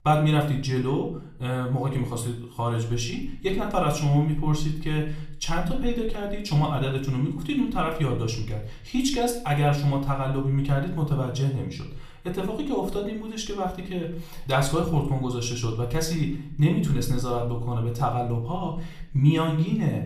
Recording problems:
off-mic speech; far
room echo; slight; dies away in 0.5 s

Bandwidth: 15 kHz